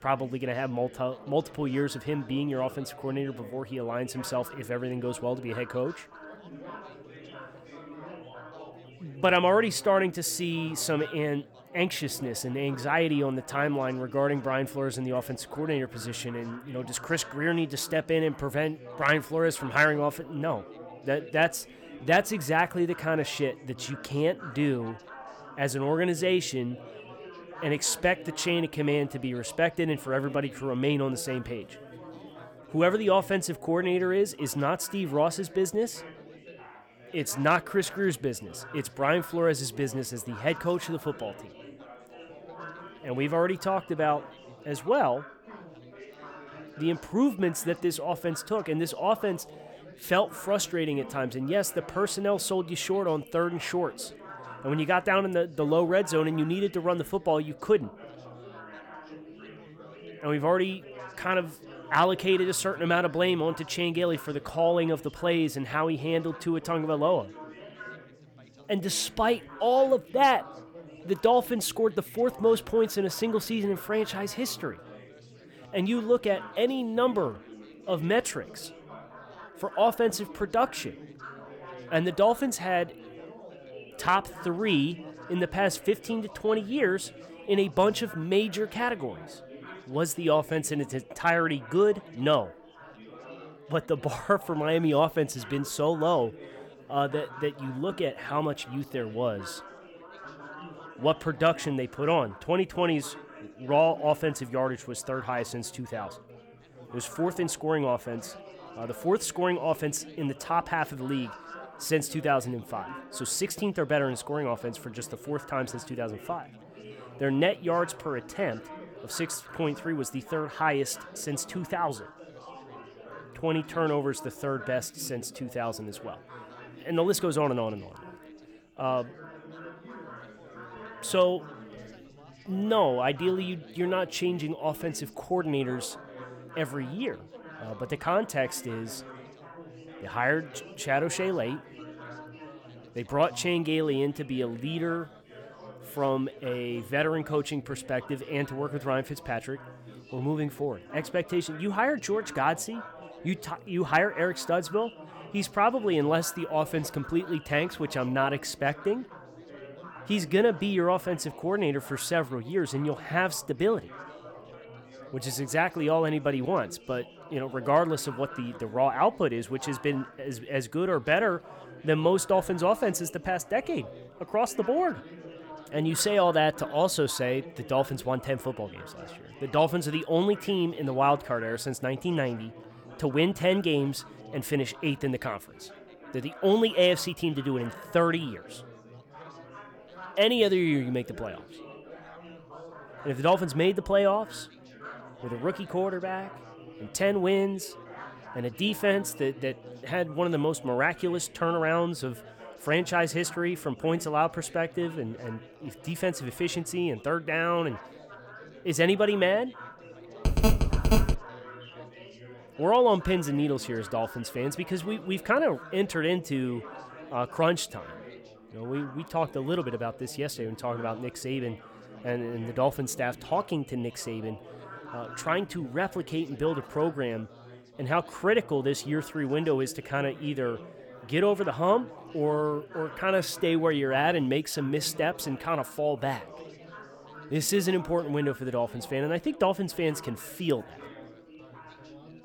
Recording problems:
chatter from many people; noticeable; throughout; 20 dB below the speech
phone ringing; loud; at 3:30; peak 3 dB above the speech

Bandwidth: 18 kHz